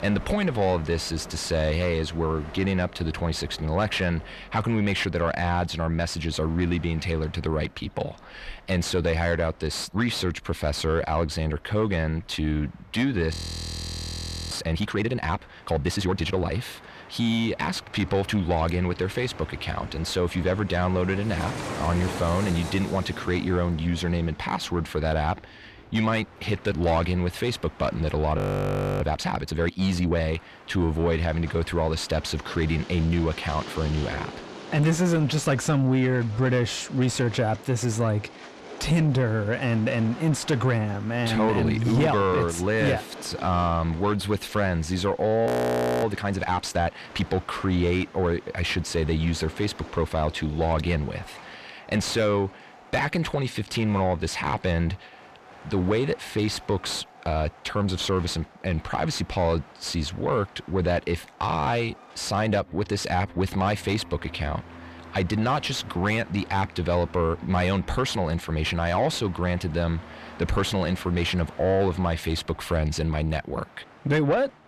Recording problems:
distortion; slight; 10 dB below the speech
train or aircraft noise; noticeable; throughout; 15 dB below the speech
audio freezing; at 13 s for 1 s, at 28 s for 0.5 s and at 45 s for 0.5 s

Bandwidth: 14 kHz